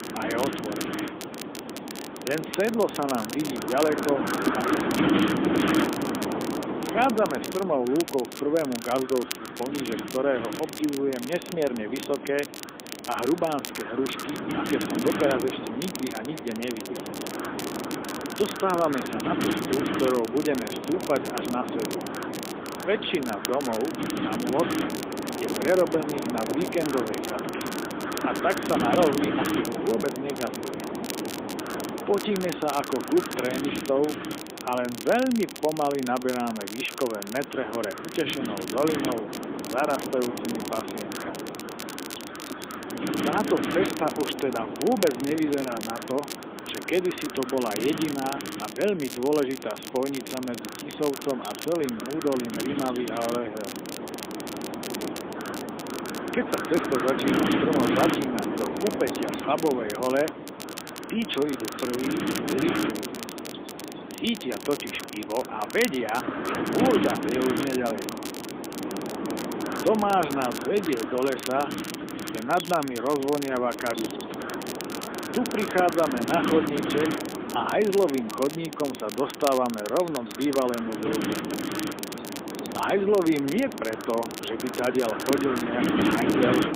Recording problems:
phone-call audio; poor line
wind noise on the microphone; heavy; 4 dB below the speech
crackle, like an old record; noticeable; 10 dB below the speech
animal sounds; faint; throughout; 25 dB below the speech
hiss; faint; throughout; 25 dB below the speech

